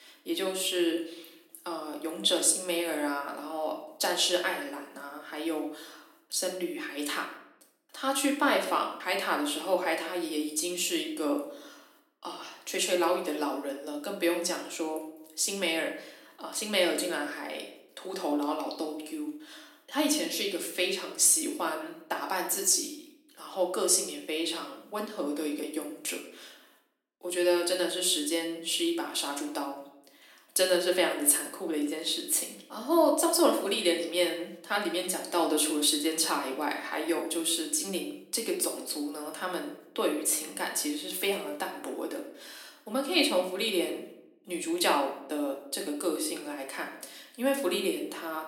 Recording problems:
room echo; slight; dies away in 0.6 s
off-mic speech; somewhat distant
thin; very slightly; fading below 250 Hz

